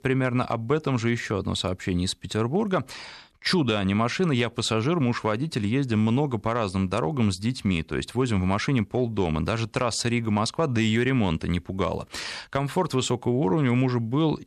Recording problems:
none

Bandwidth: 13.5 kHz